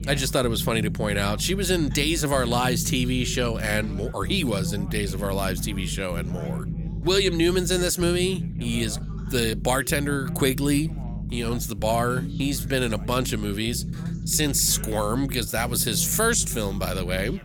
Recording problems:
low rumble; noticeable; throughout; 15 dB below the speech
background chatter; faint; throughout; 2 voices, 20 dB below the speech

